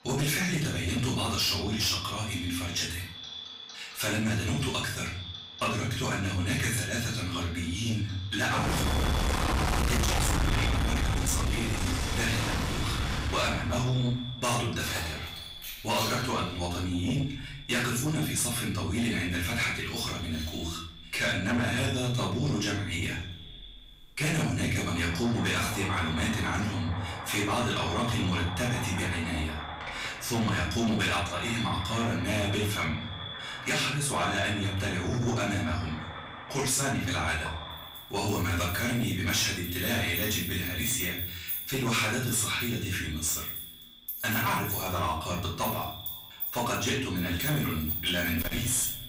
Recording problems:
distortion; heavy; 7 dB below the speech
off-mic speech; far
echo of what is said; noticeable; throughout; 190 ms later, 15 dB below the speech
room echo; noticeable; dies away in 0.5 s
household noises; loud; throughout; 5 dB below the speech

